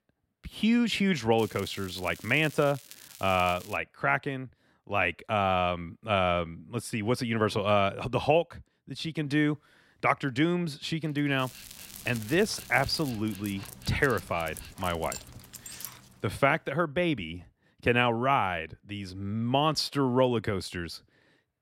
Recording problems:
crackling; noticeable; from 1.5 to 4 s and from 11 to 13 s; 20 dB below the speech
dog barking; faint; from 11 to 16 s; peak 10 dB below the speech

